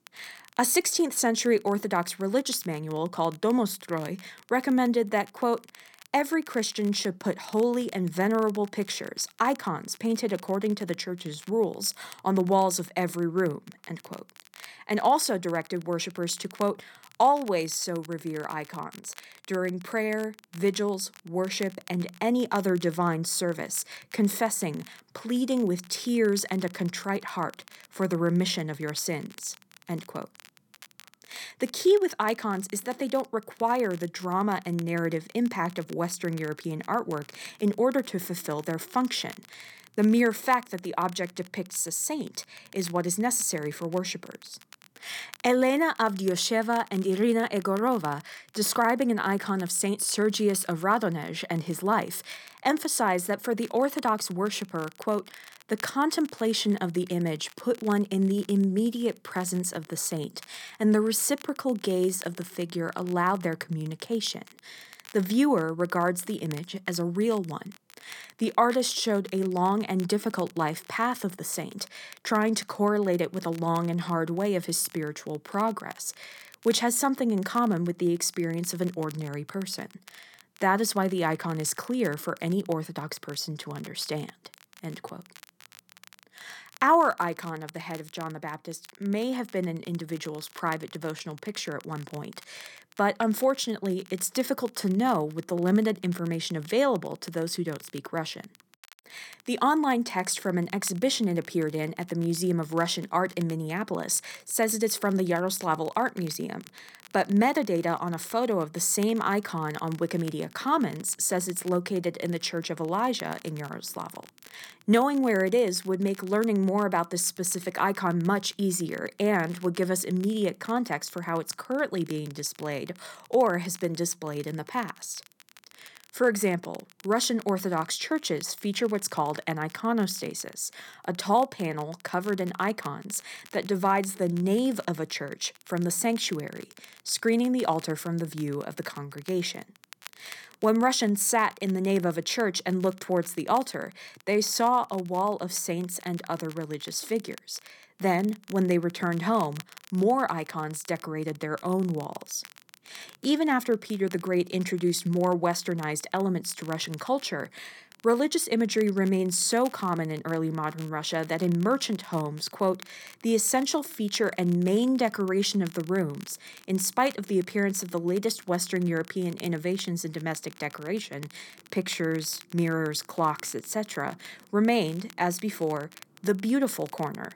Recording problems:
crackle, like an old record; faint; 25 dB below the speech

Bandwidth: 17.5 kHz